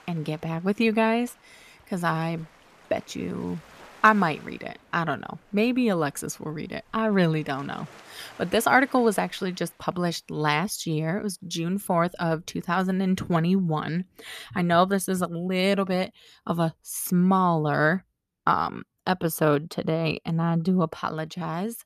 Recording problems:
rain or running water; faint; throughout; 25 dB below the speech

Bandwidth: 14.5 kHz